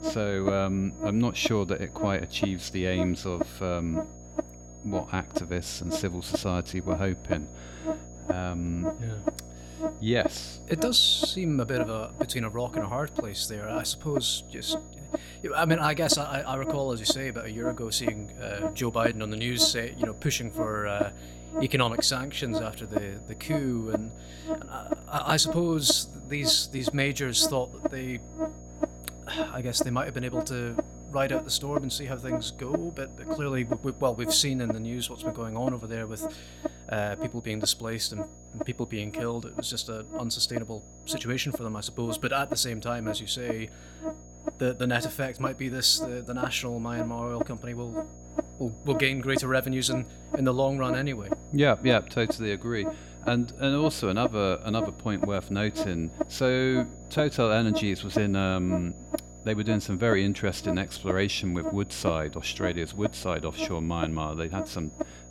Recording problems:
electrical hum; loud; throughout; 60 Hz, 7 dB below the speech
high-pitched whine; faint; throughout; 6.5 kHz, 25 dB below the speech

